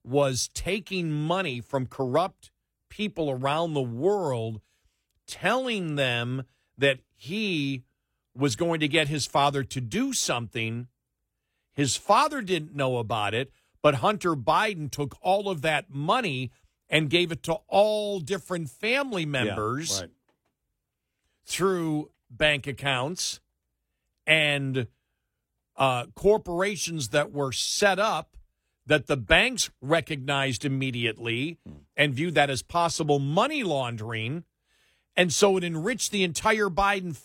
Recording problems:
none

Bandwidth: 16.5 kHz